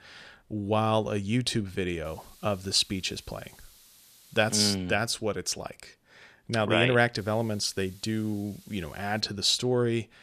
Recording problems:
hiss; faint; from 2 to 5 s and from 7 to 9 s; 25 dB below the speech

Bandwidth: 14.5 kHz